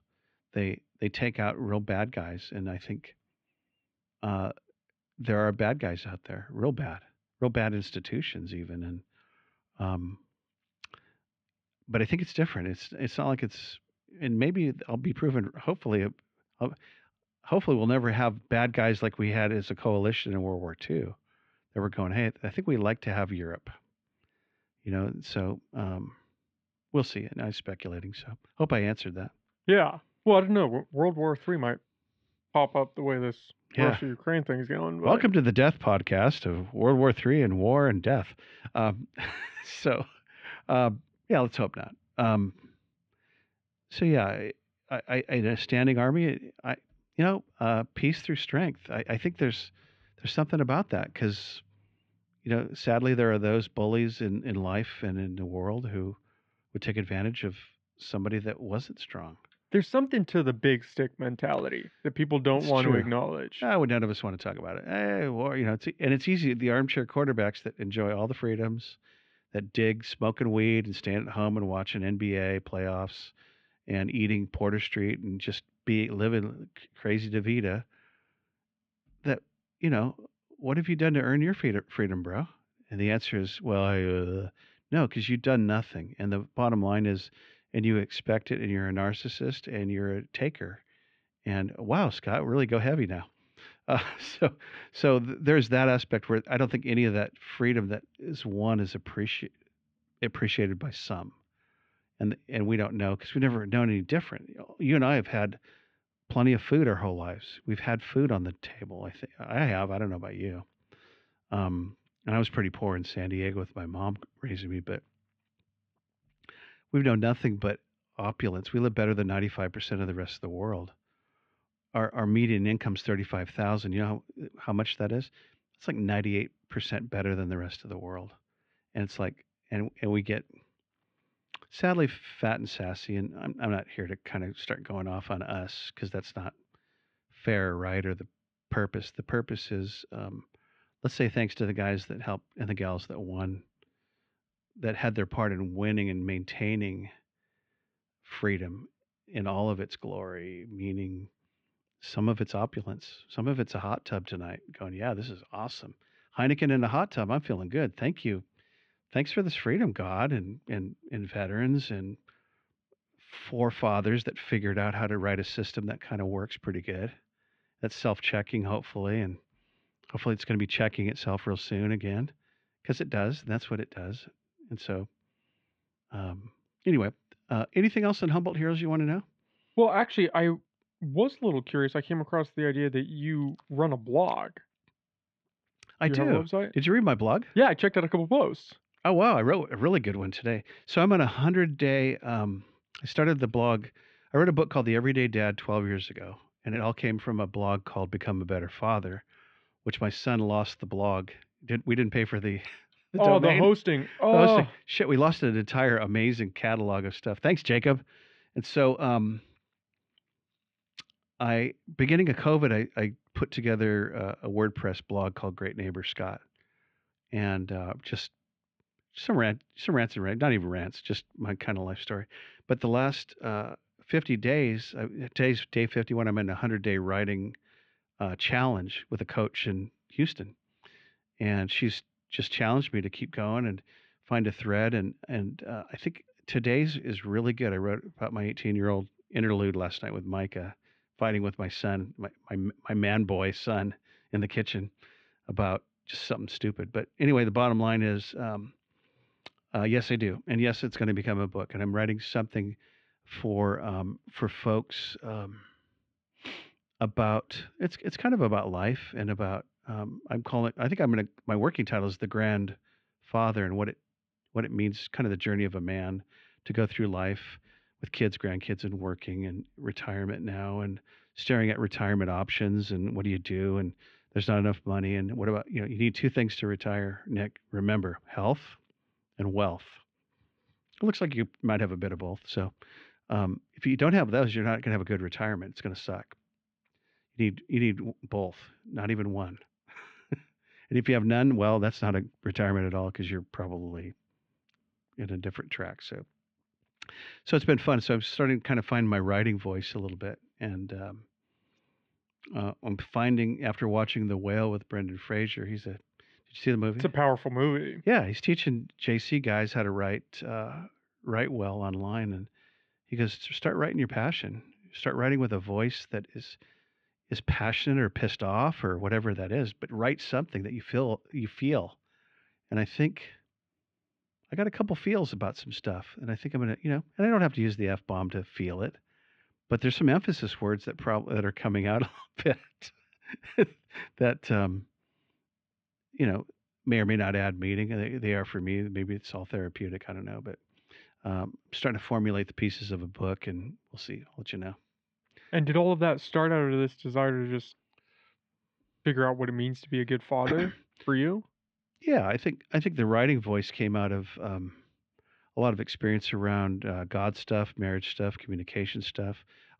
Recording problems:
muffled; slightly; fading above 3 kHz

